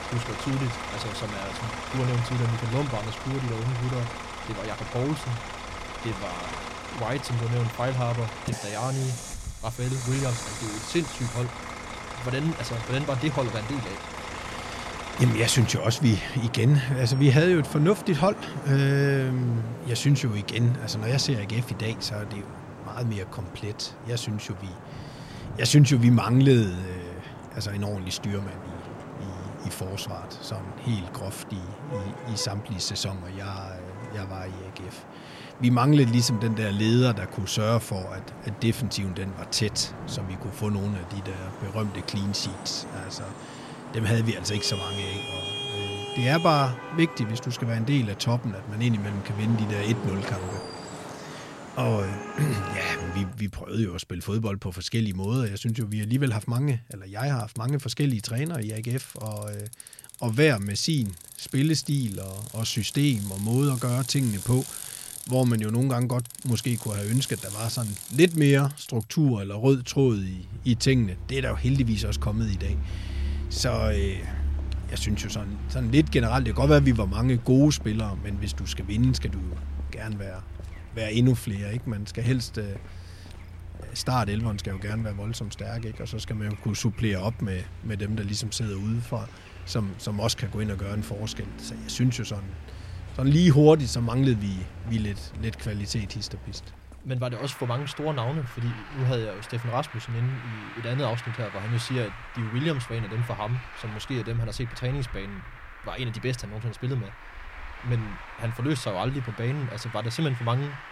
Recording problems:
traffic noise; noticeable; throughout; 10 dB below the speech

